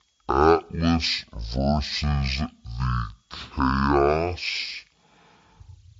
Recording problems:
wrong speed and pitch; too slow and too low; 0.5 times normal speed

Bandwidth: 7.5 kHz